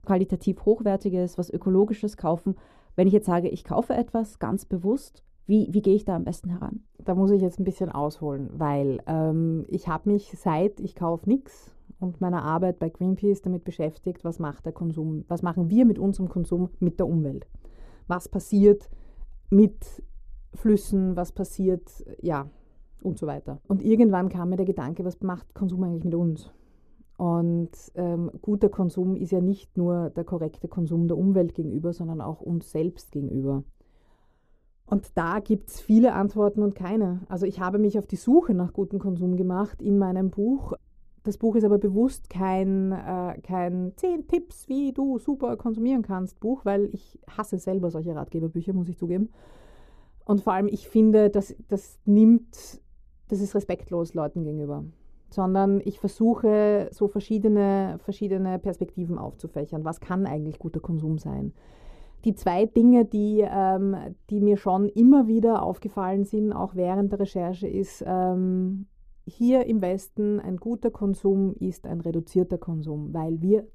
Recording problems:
muffled; slightly; fading above 1 kHz

